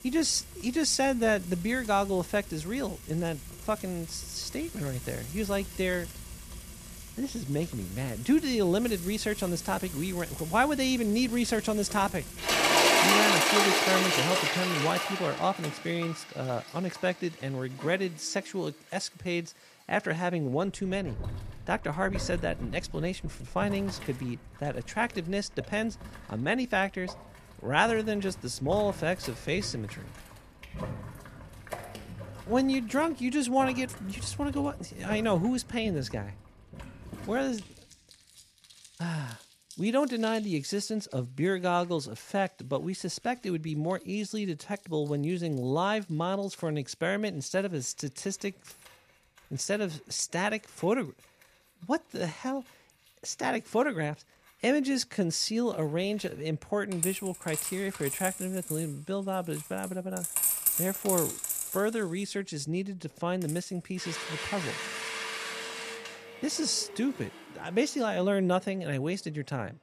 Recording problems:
household noises; loud; throughout; 2 dB below the speech

